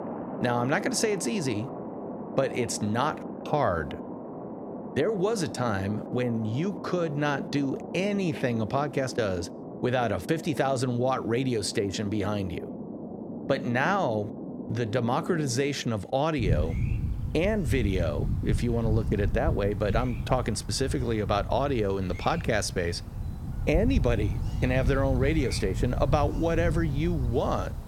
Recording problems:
rain or running water; loud; throughout; 6 dB below the speech

